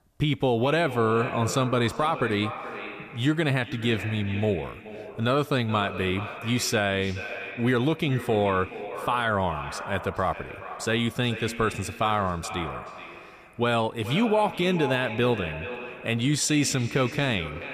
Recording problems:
echo of what is said; strong; throughout; 430 ms later, 10 dB below the speech

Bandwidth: 14.5 kHz